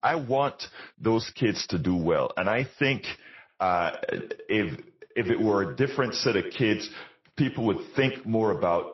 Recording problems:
echo of what is said; strong; from 3.5 s on; 80 ms later, 10 dB below the speech
garbled, watery; slightly; nothing above 5.5 kHz

